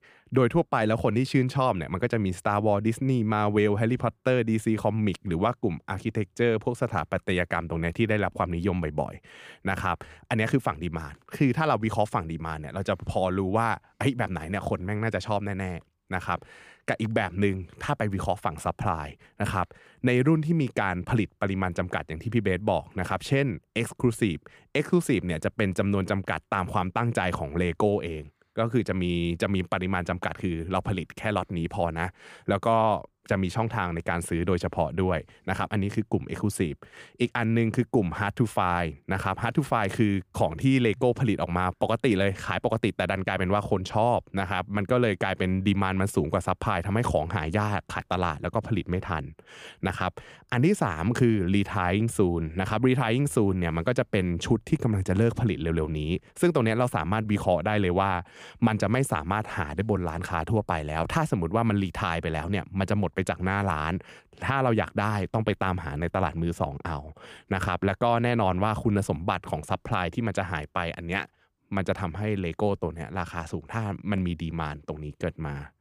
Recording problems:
none

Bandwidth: 15 kHz